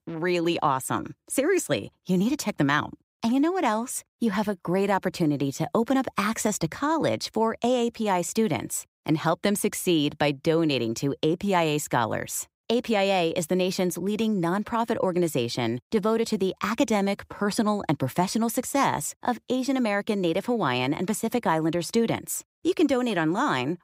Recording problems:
none

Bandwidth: 15.5 kHz